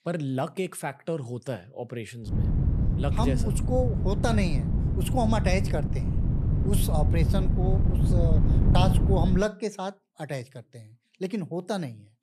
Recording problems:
wind noise on the microphone; heavy; from 2.5 to 9.5 s; 5 dB below the speech

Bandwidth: 13.5 kHz